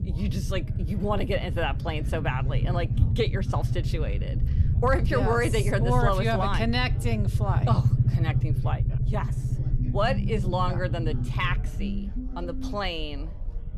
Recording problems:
low rumble; noticeable; throughout; 10 dB below the speech
background chatter; faint; throughout; 4 voices, 25 dB below the speech

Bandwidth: 15 kHz